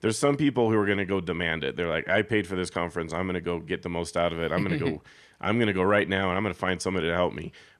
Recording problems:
none

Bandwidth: 13.5 kHz